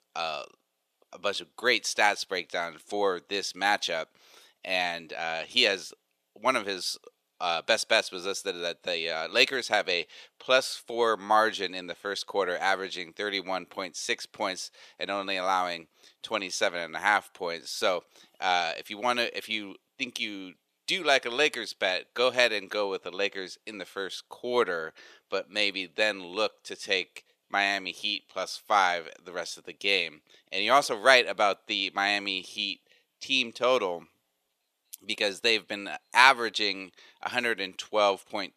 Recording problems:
thin; somewhat; fading below 500 Hz

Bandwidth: 14.5 kHz